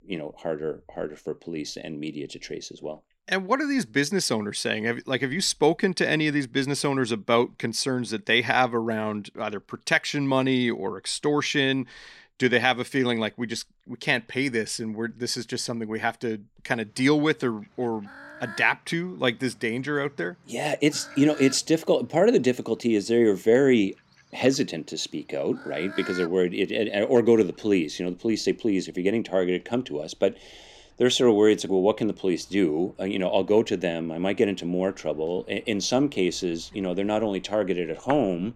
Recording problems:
animal sounds; faint; throughout; 20 dB below the speech

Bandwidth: 16 kHz